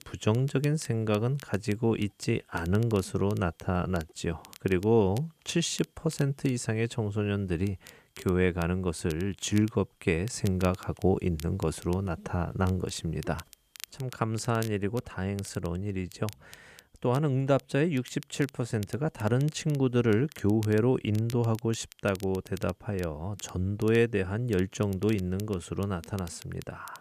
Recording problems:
crackle, like an old record; faint; 20 dB below the speech

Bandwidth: 14.5 kHz